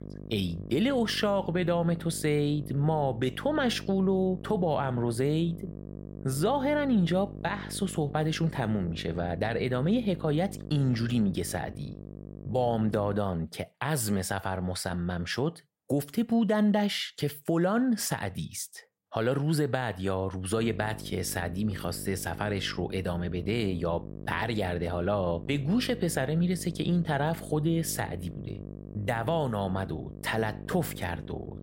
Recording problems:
electrical hum; noticeable; until 13 s and from 21 s on; 50 Hz, 15 dB below the speech

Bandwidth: 16 kHz